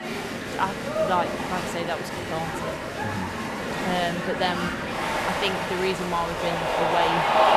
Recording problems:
crowd noise; very loud; throughout; 2 dB above the speech

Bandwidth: 14 kHz